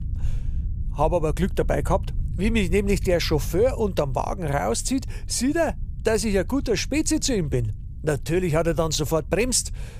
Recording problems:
low rumble; faint; throughout; 25 dB below the speech

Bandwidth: 15 kHz